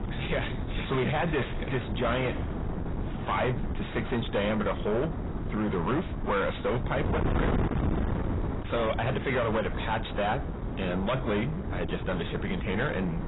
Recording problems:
distortion; heavy; 6 dB below the speech
garbled, watery; badly; nothing above 4 kHz
wind noise on the microphone; heavy; 7 dB below the speech

